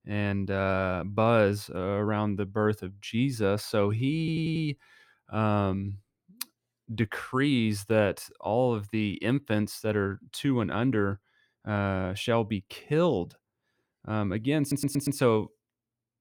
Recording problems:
audio stuttering; at 4 s and at 15 s

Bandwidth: 18.5 kHz